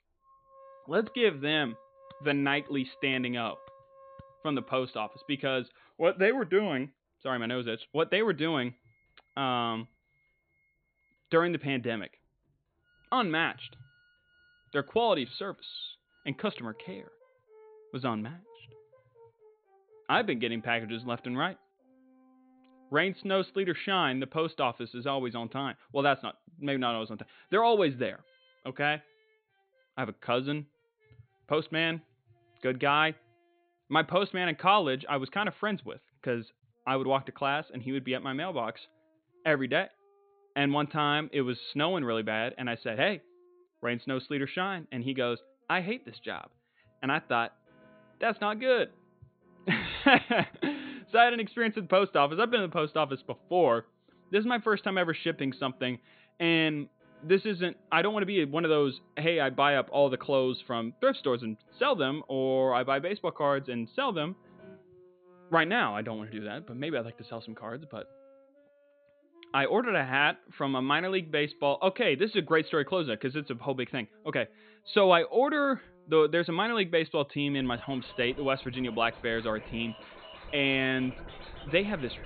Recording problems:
high frequencies cut off; severe; nothing above 4.5 kHz
background music; faint; throughout; 25 dB below the speech

